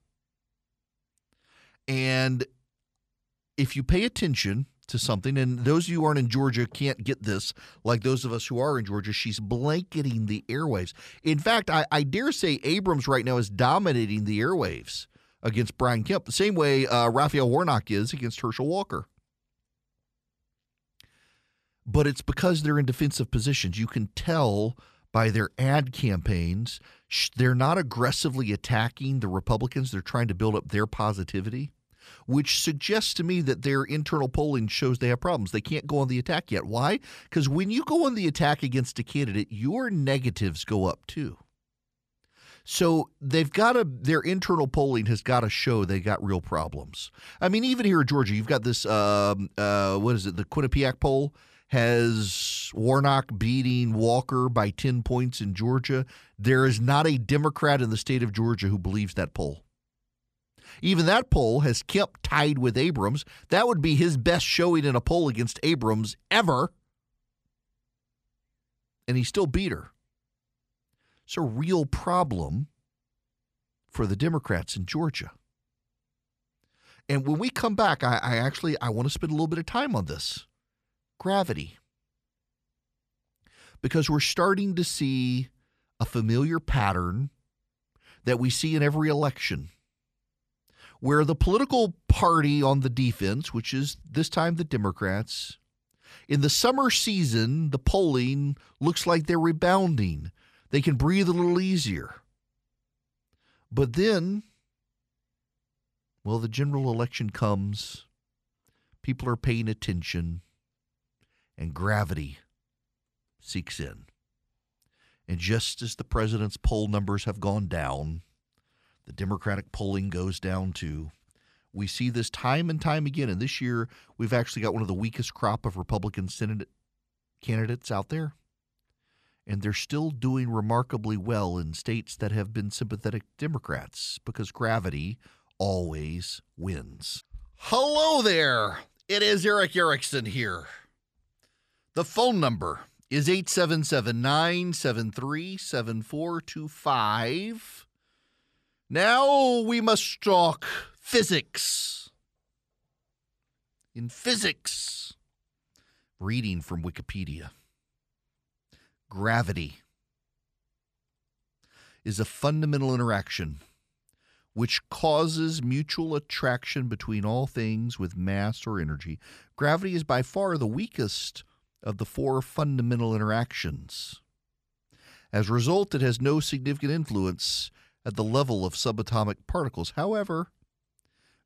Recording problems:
none

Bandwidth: 14.5 kHz